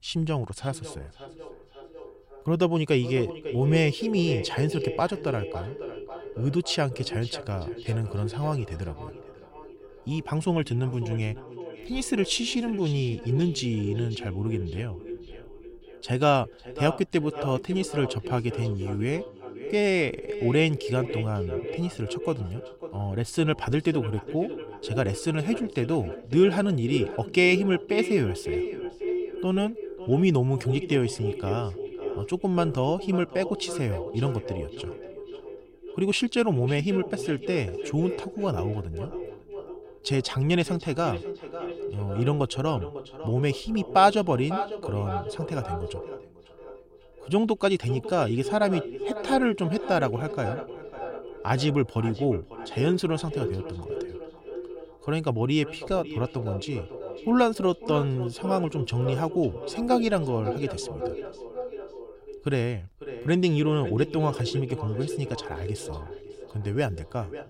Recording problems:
echo of what is said; strong; throughout; 550 ms later, 9 dB below the speech

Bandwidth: 16 kHz